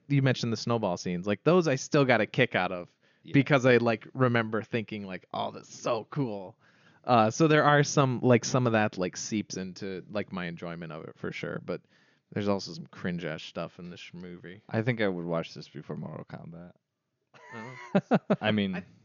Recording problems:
high frequencies cut off; noticeable; nothing above 7 kHz

